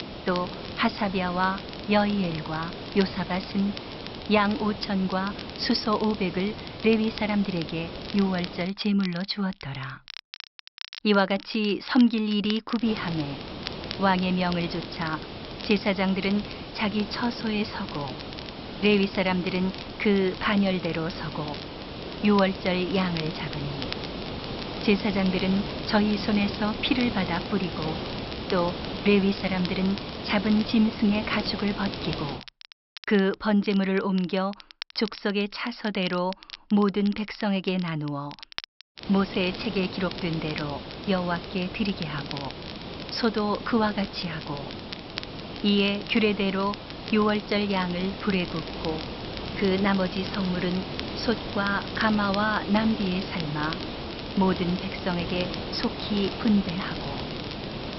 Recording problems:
high frequencies cut off; noticeable; nothing above 5.5 kHz
hiss; loud; until 8.5 s, from 13 to 32 s and from 39 s on; 9 dB below the speech
crackle, like an old record; noticeable; 15 dB below the speech

